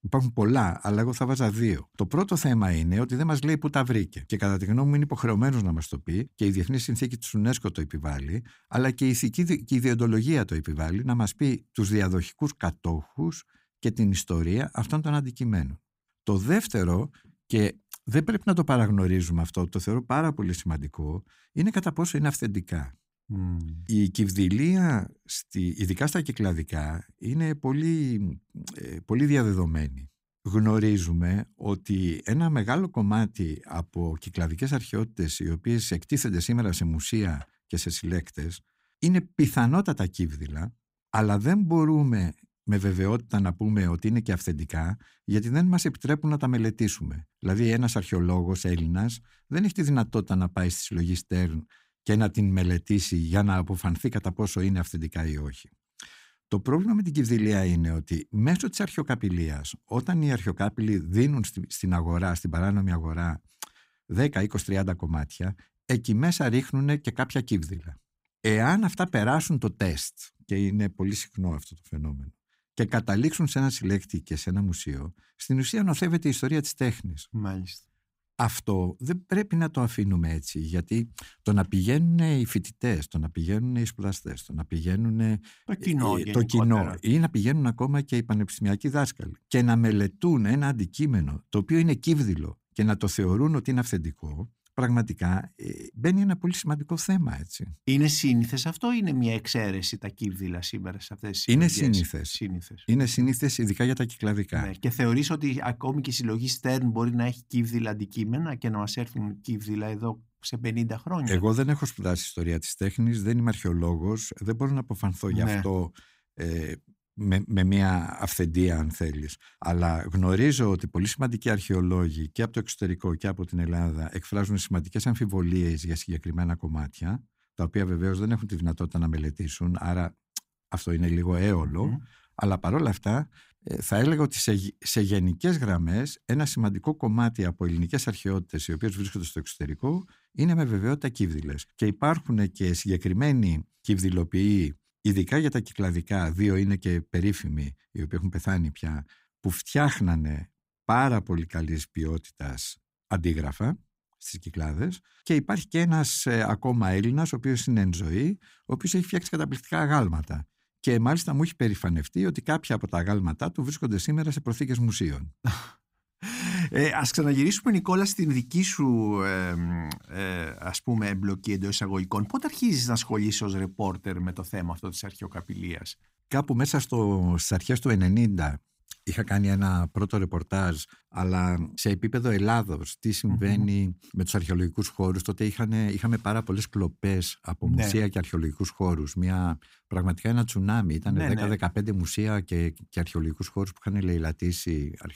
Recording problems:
none

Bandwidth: 15.5 kHz